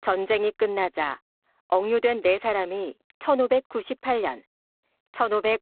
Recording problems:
phone-call audio; poor line; nothing above 3.5 kHz

